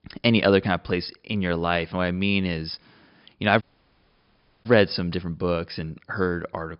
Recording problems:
high frequencies cut off; noticeable; nothing above 5.5 kHz
audio cutting out; at 3.5 s for 1 s

